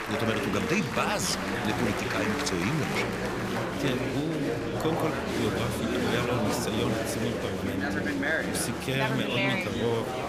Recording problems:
murmuring crowd; very loud; throughout; 1 dB above the speech

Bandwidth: 14.5 kHz